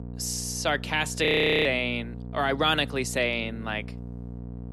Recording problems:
electrical hum; faint; throughout; 60 Hz, 20 dB below the speech
audio freezing; at 1.5 s

